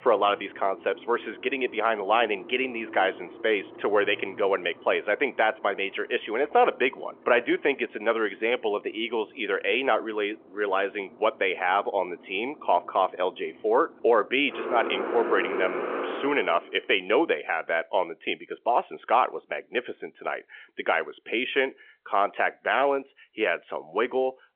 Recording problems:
phone-call audio; nothing above 3.5 kHz
traffic noise; loud; until 16 s; 10 dB below the speech

